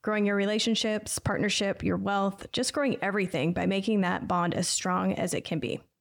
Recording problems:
none

